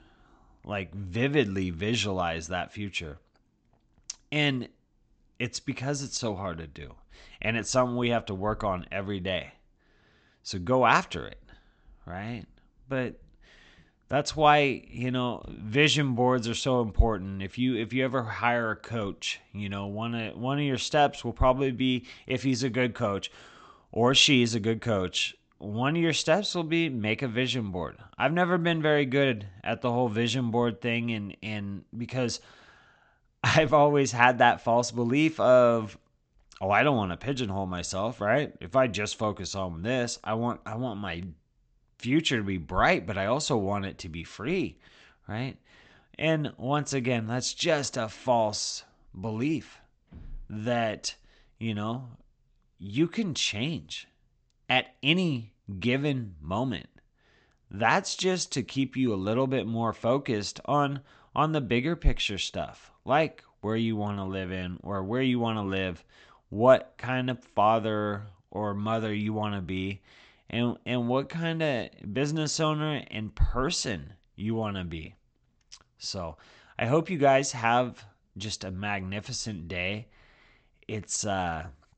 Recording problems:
high frequencies cut off; noticeable; nothing above 8 kHz

